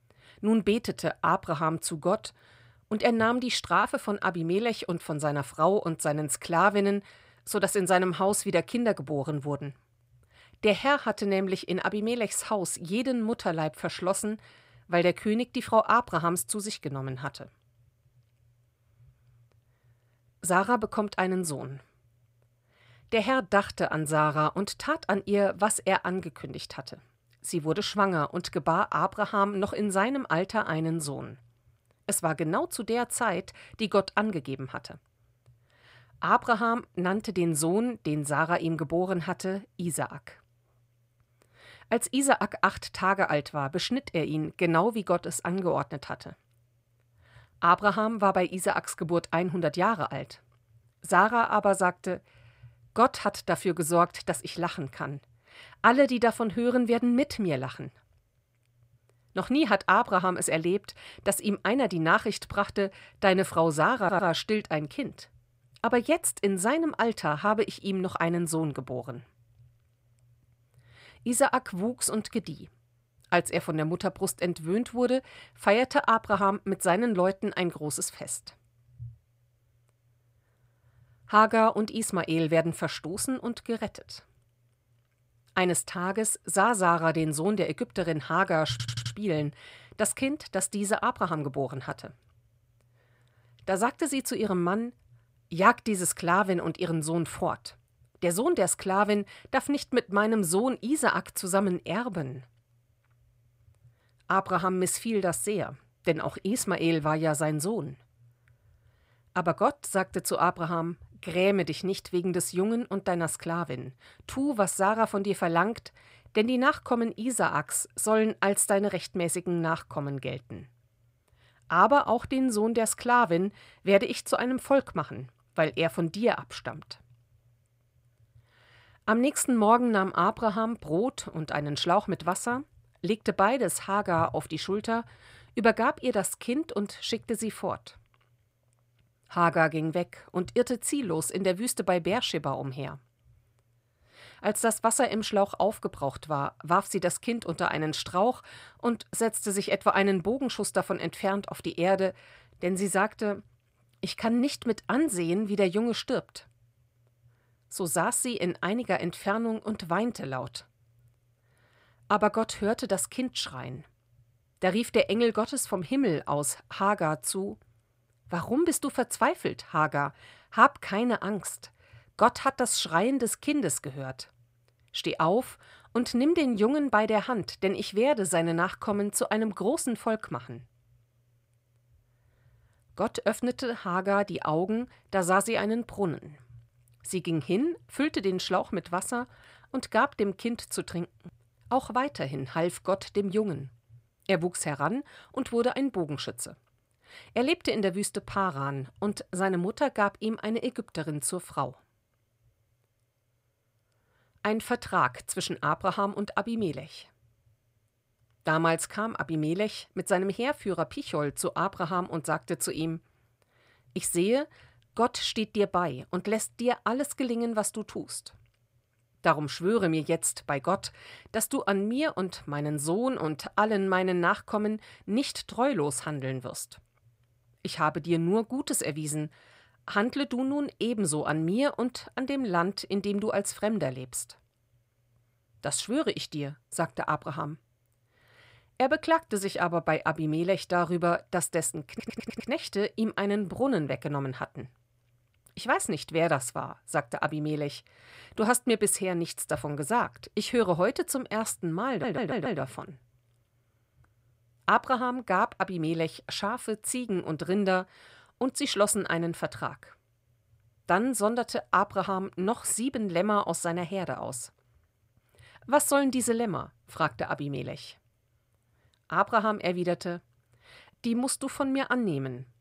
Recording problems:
audio stuttering; 4 times, first at 1:04

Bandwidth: 15.5 kHz